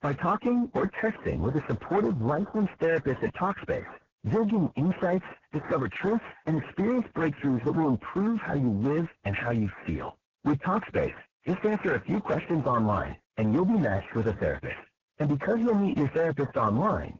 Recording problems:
distortion; heavy; 4 dB below the speech
garbled, watery; badly; nothing above 7 kHz

